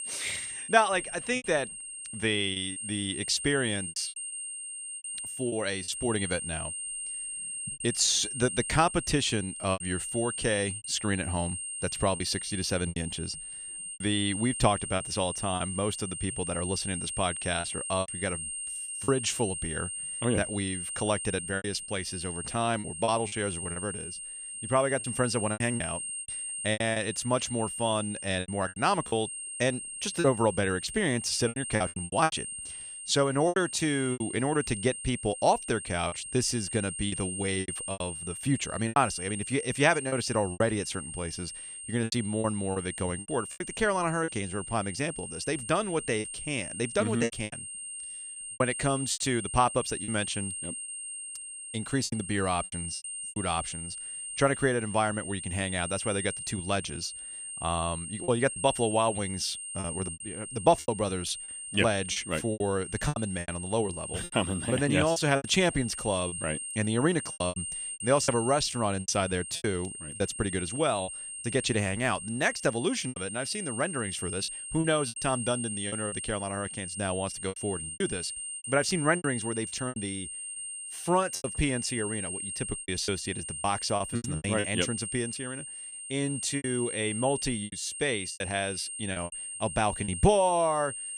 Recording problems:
high-pitched whine; loud; throughout; 8.5 kHz, 6 dB below the speech
choppy; very; 9% of the speech affected

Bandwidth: 15 kHz